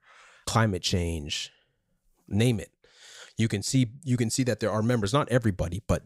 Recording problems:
none

